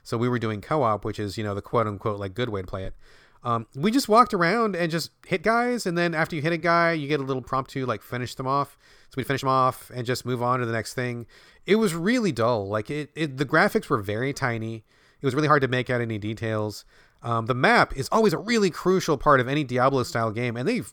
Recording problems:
uneven, jittery; strongly; from 1.5 to 20 s

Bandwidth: 18.5 kHz